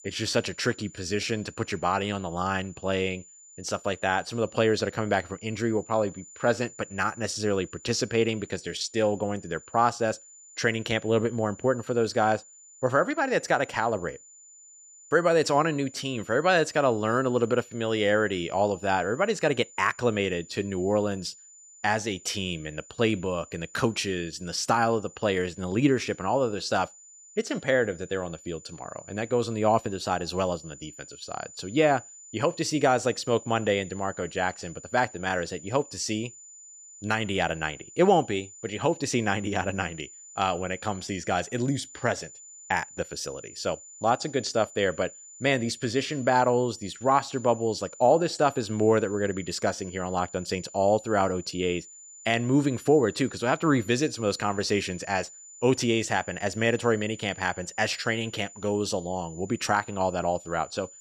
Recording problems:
high-pitched whine; noticeable; throughout; 7 kHz, 20 dB below the speech

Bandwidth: 14 kHz